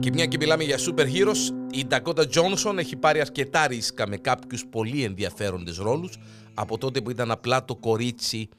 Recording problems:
background music; noticeable; throughout; 10 dB below the speech

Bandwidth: 15 kHz